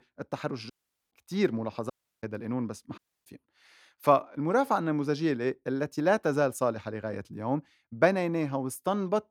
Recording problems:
audio cutting out; at 0.5 s, at 2 s and at 3 s

